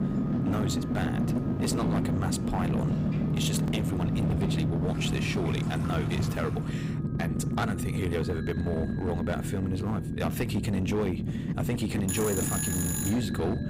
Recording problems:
distortion; slight; 16% of the sound clipped
alarms or sirens; loud; throughout; 2 dB below the speech
low rumble; loud; throughout; 3 dB below the speech
rain or running water; noticeable; until 6.5 s; 10 dB below the speech

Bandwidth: 15.5 kHz